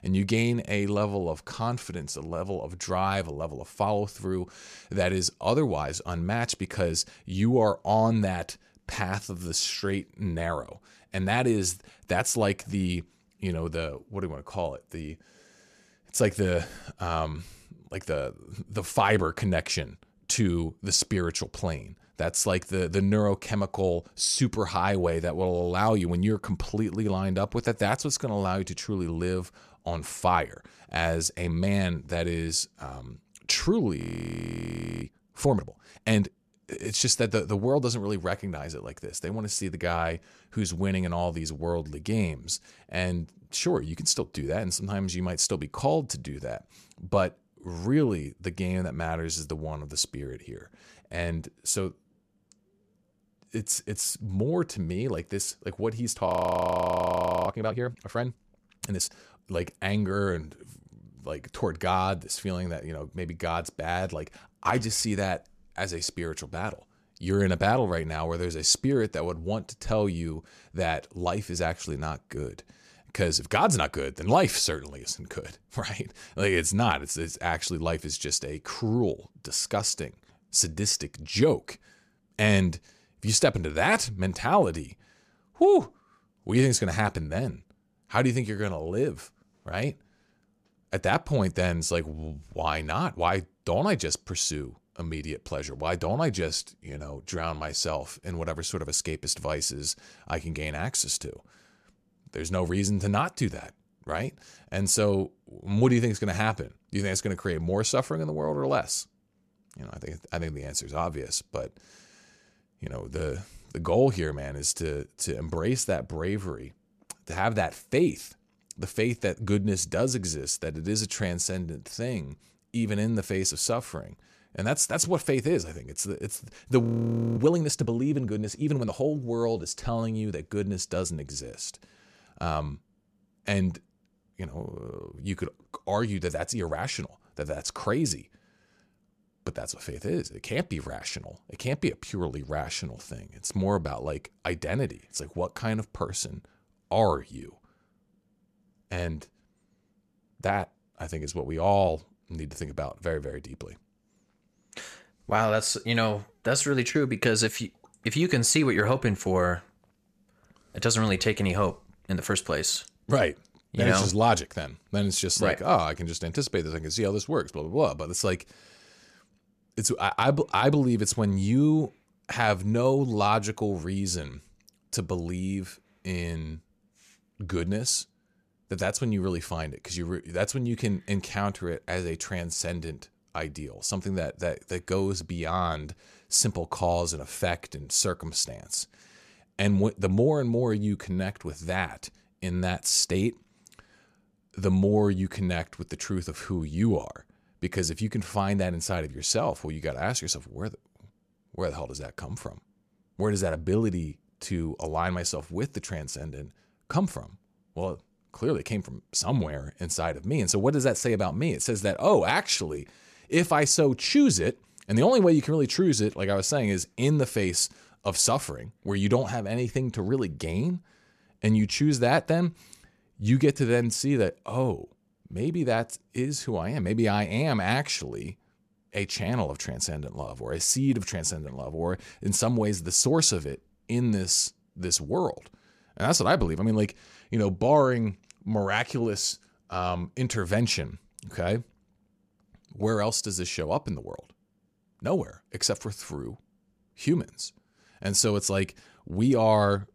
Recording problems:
audio freezing; at 34 s for 1 s, at 56 s for 1 s and at 2:07 for 0.5 s

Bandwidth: 14.5 kHz